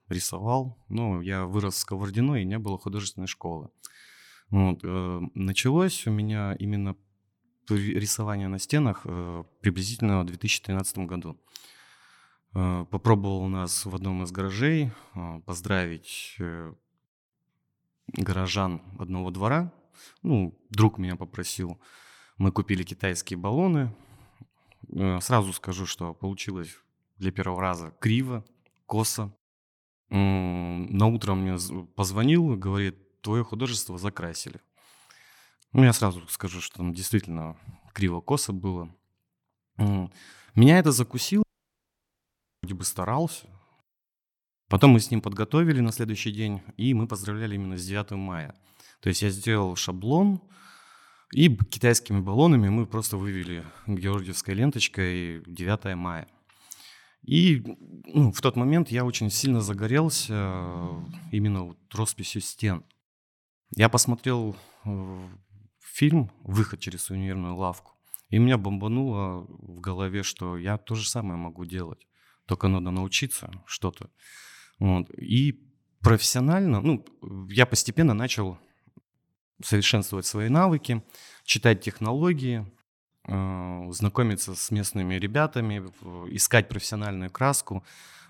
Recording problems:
audio cutting out; at 41 s for 1 s

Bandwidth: 18.5 kHz